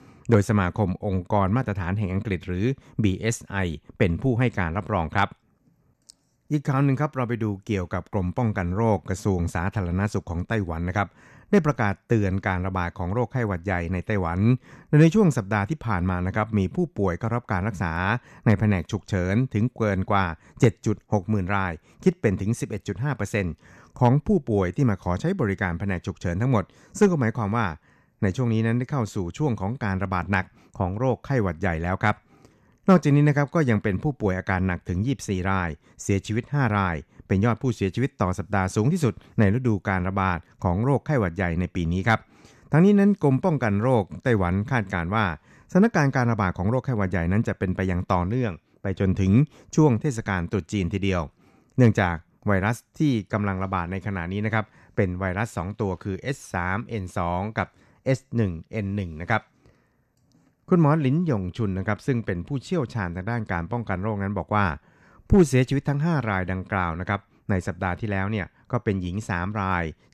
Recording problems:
none

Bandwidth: 13.5 kHz